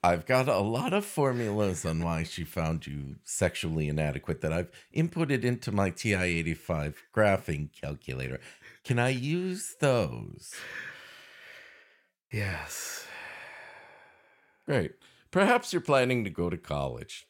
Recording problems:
none

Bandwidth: 16.5 kHz